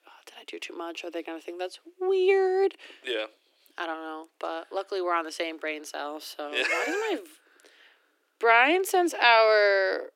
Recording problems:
thin; very; fading below 300 Hz

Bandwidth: 16.5 kHz